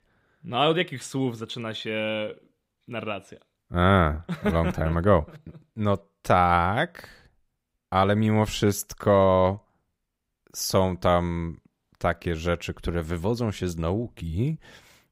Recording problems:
none

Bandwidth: 15.5 kHz